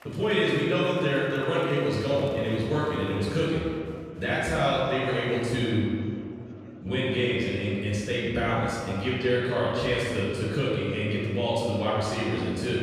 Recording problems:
room echo; strong; dies away in 2.1 s
off-mic speech; far
murmuring crowd; faint; throughout; 25 dB below the speech

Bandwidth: 14 kHz